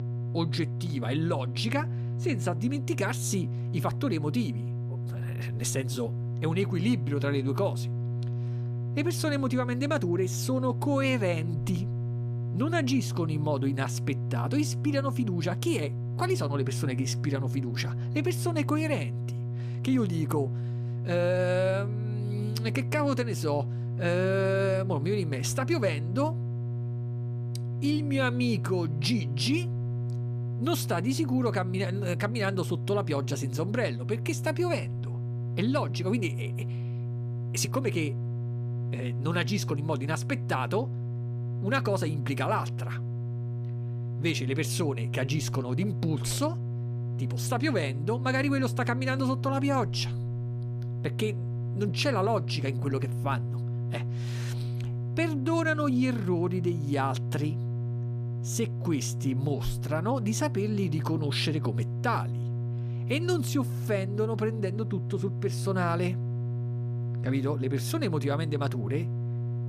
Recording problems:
electrical hum; noticeable; throughout; 60 Hz, 10 dB below the speech

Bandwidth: 14.5 kHz